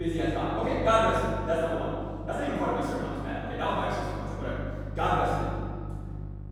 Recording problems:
room echo; strong; dies away in 2.5 s
off-mic speech; far
wrong speed, natural pitch; too fast; 1.5 times normal speed
electrical hum; faint; throughout; 50 Hz, 20 dB below the speech
abrupt cut into speech; at the start

